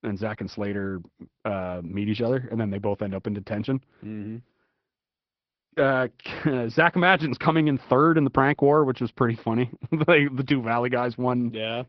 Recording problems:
high frequencies cut off; noticeable; nothing above 5.5 kHz
garbled, watery; slightly

